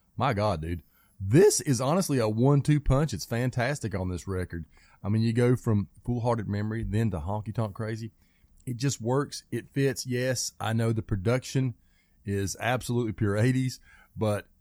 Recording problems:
none

